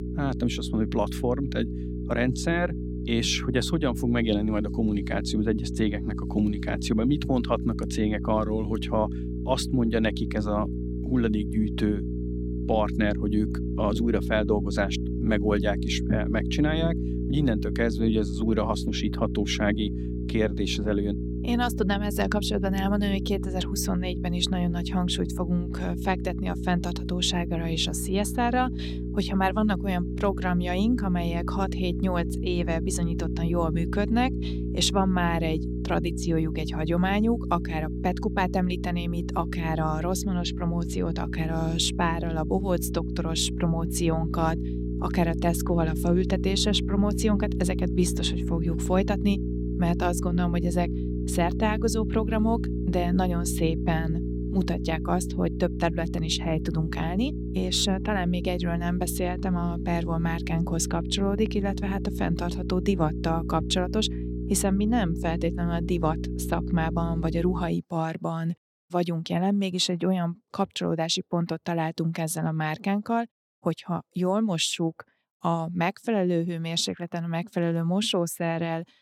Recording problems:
electrical hum; loud; until 1:08; 60 Hz, 9 dB below the speech

